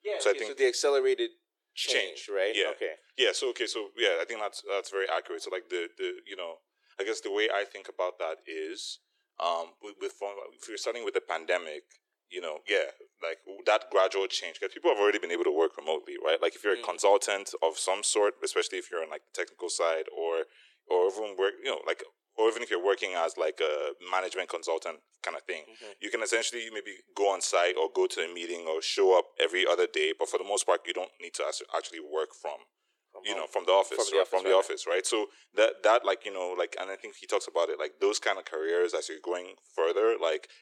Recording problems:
thin; very; fading below 350 Hz

